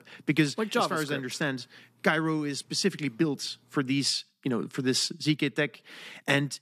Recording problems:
none

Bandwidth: 14.5 kHz